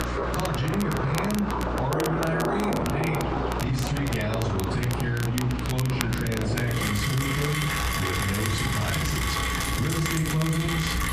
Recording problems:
off-mic speech; far
room echo; slight; dies away in 0.4 s
squashed, flat; somewhat
rain or running water; loud; throughout; 2 dB below the speech
crackle, like an old record; loud; 10 dB below the speech
electrical hum; noticeable; throughout; 60 Hz, 15 dB below the speech

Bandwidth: 14.5 kHz